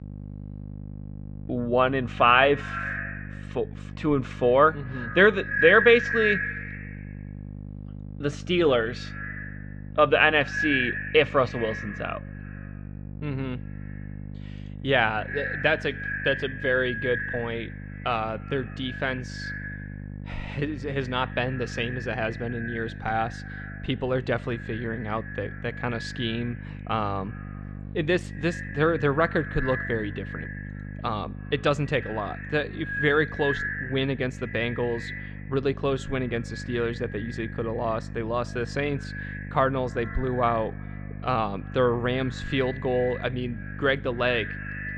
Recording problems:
echo of what is said; strong; throughout; 100 ms later, 8 dB below the speech
muffled; slightly; fading above 3.5 kHz
electrical hum; faint; throughout; 50 Hz, 25 dB below the speech

